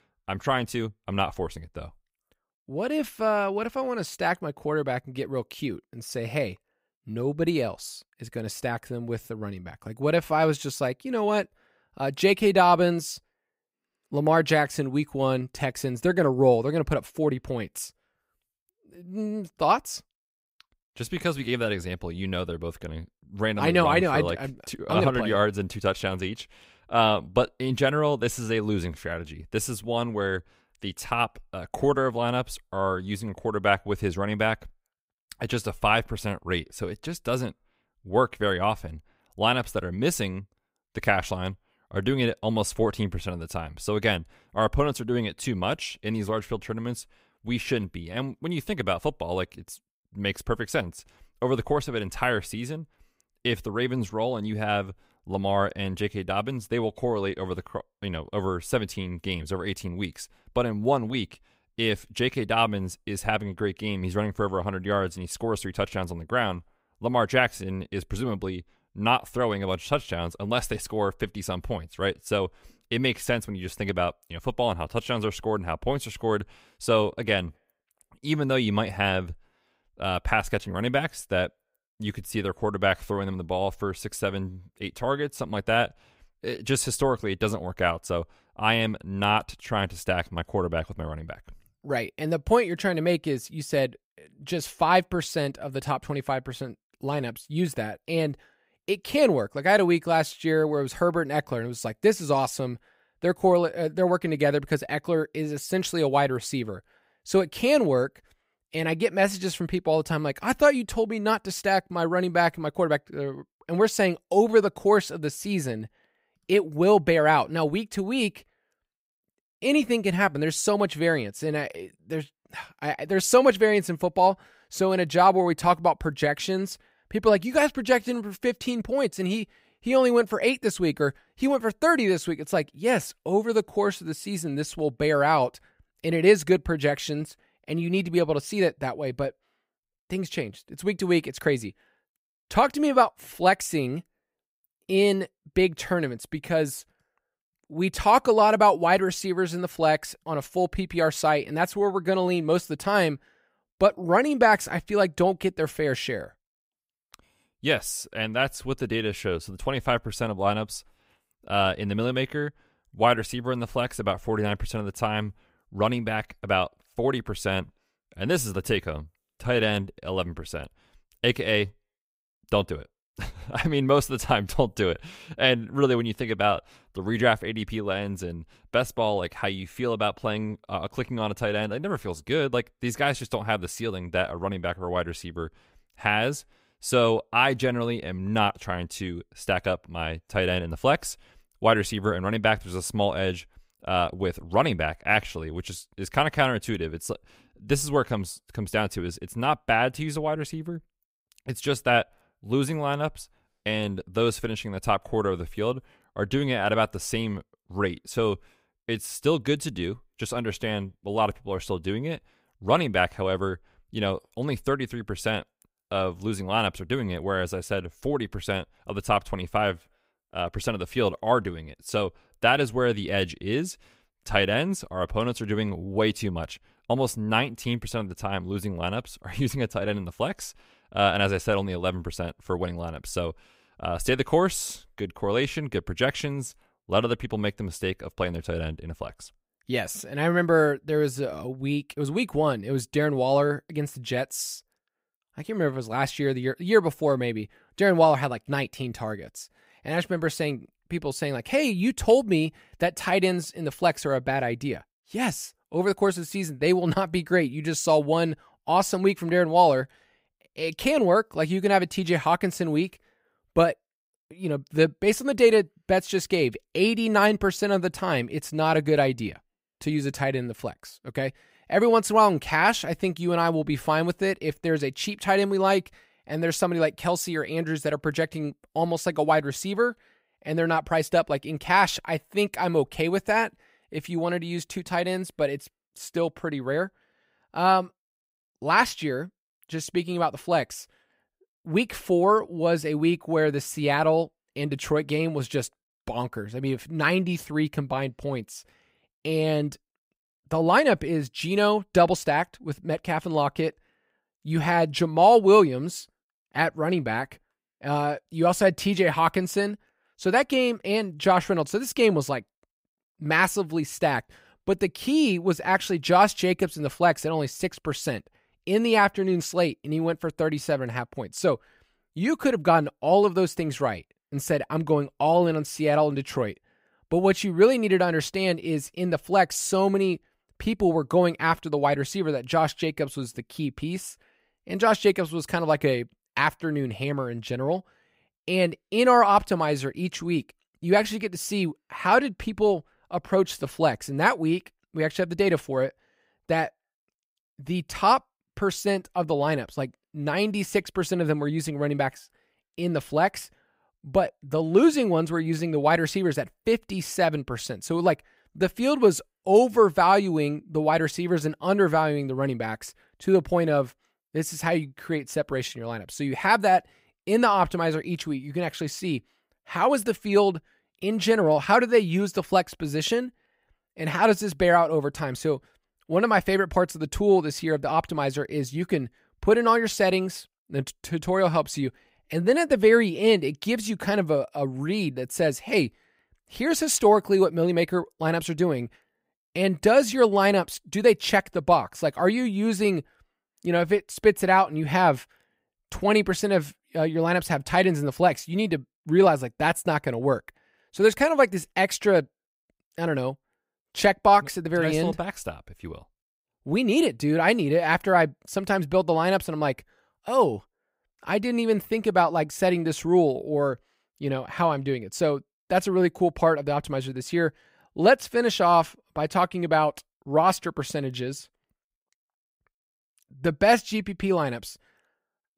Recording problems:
none

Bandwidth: 15.5 kHz